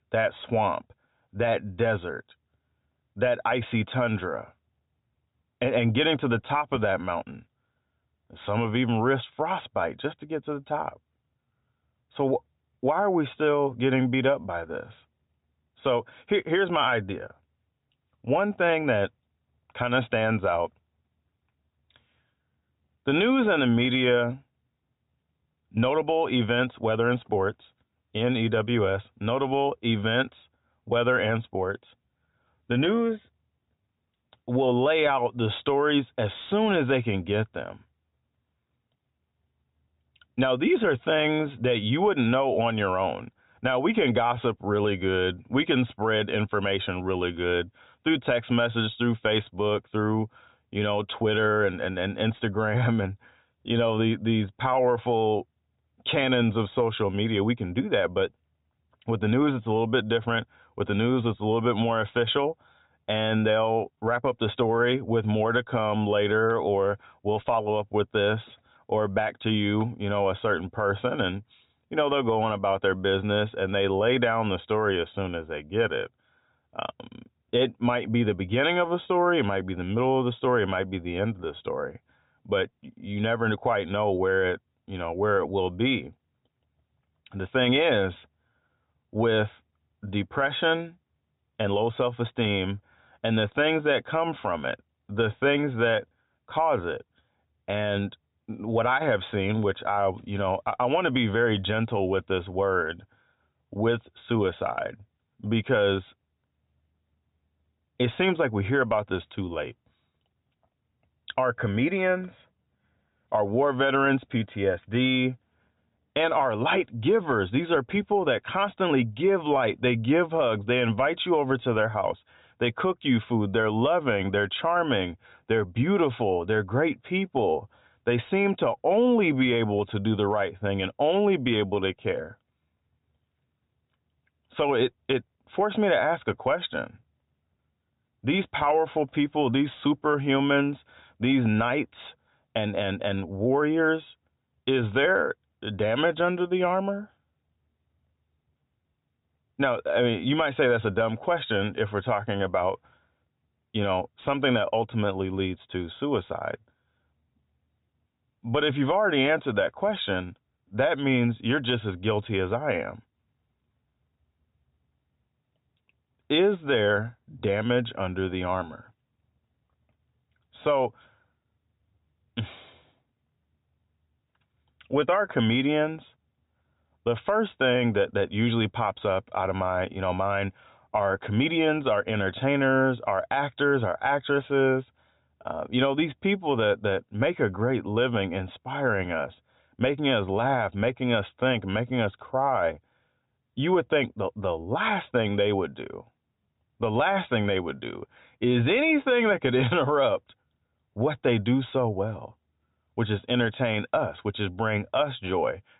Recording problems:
high frequencies cut off; severe; nothing above 4 kHz

